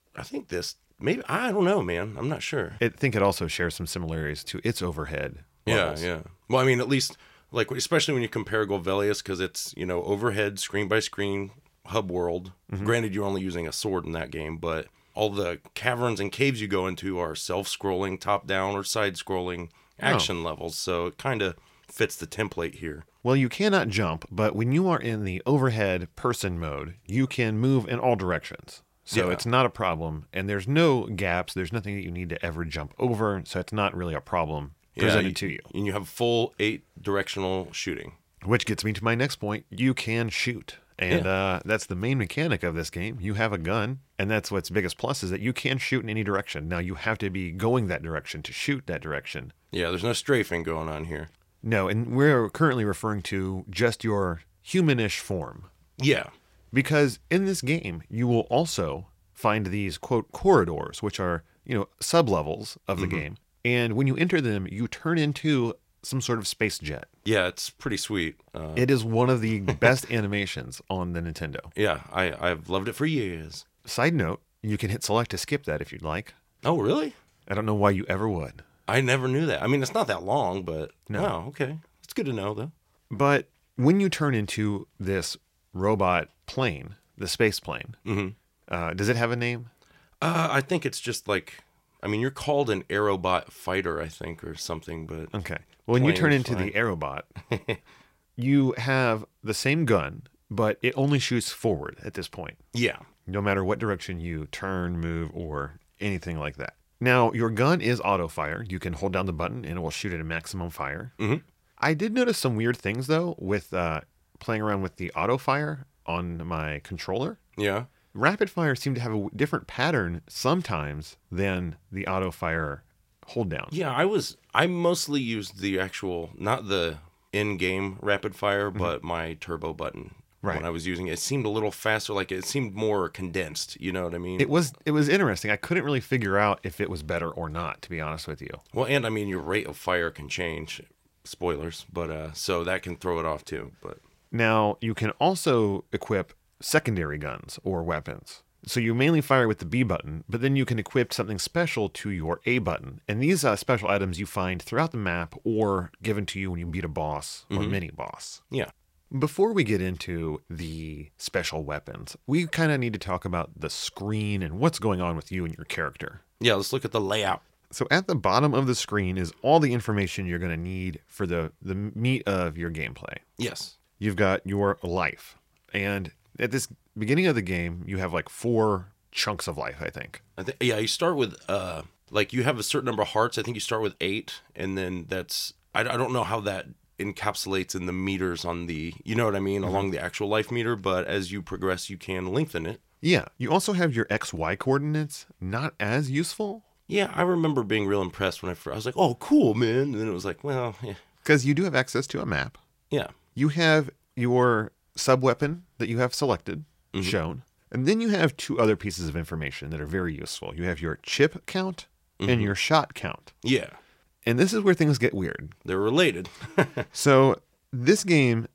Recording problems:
none

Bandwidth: 16 kHz